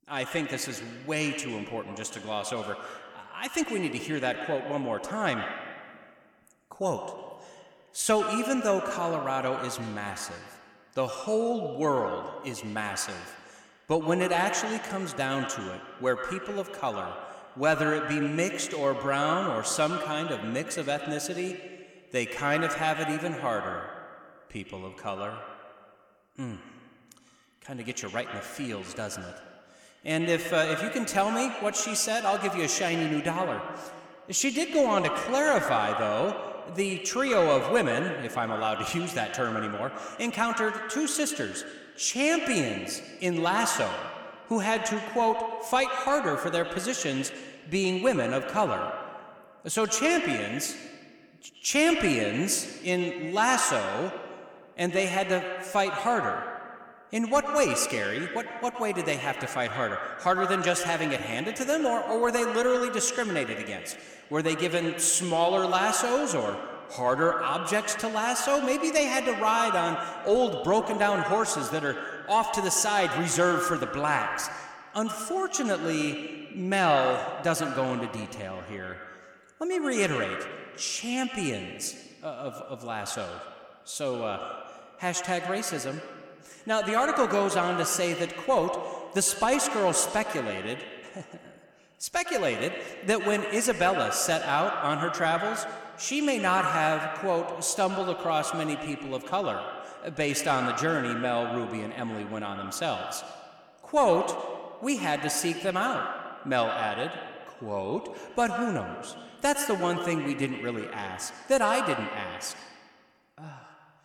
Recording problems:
echo of what is said; strong; throughout; 100 ms later, 6 dB below the speech

